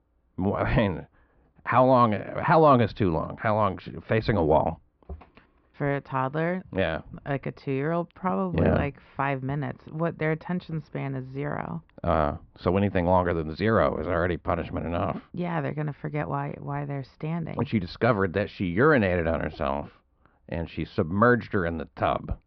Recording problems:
muffled; very; fading above 1.5 kHz
high frequencies cut off; noticeable; nothing above 5.5 kHz

